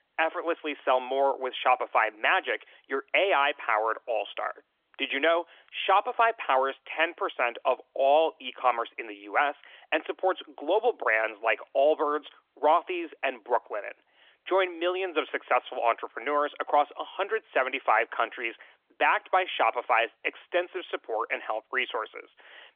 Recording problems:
phone-call audio; nothing above 3.5 kHz
thin; very slightly; fading below 300 Hz

